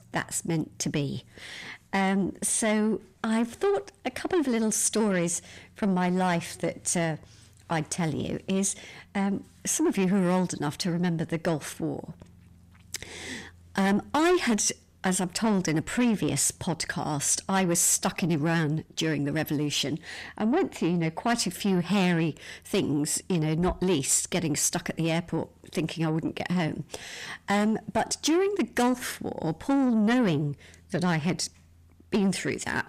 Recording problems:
distortion; slight; 10 dB below the speech

